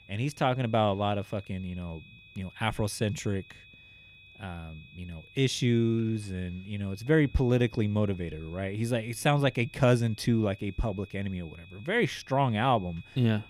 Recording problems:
high-pitched whine; faint; throughout; 2.5 kHz, 25 dB below the speech

